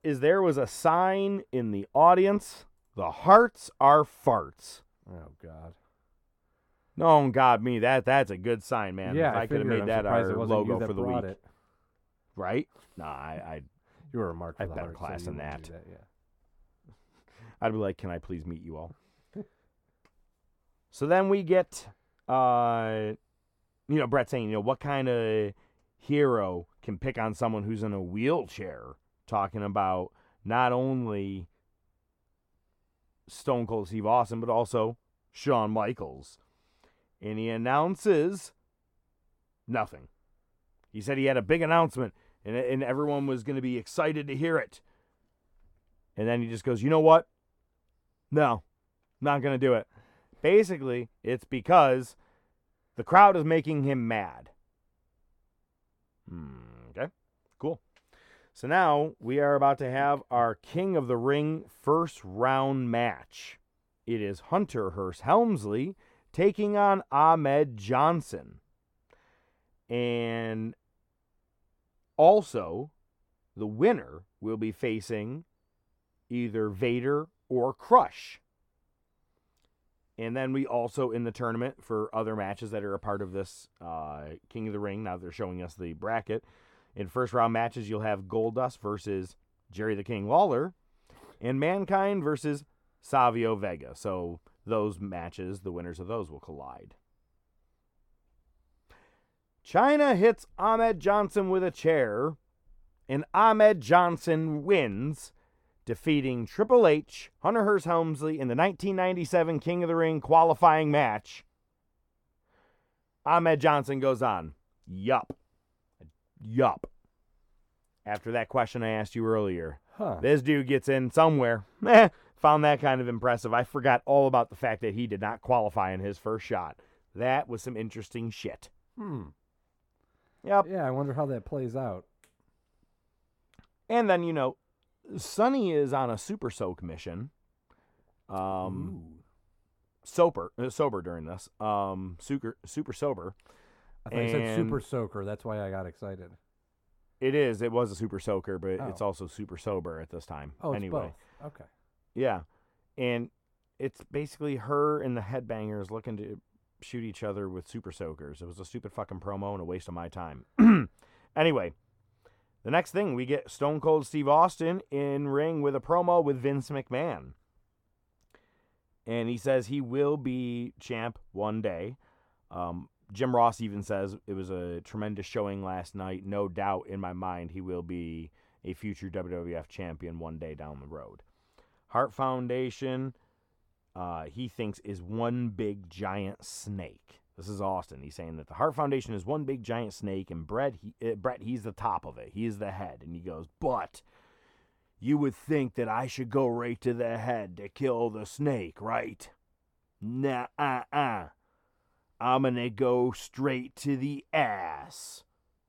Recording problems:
muffled; slightly; fading above 2 kHz

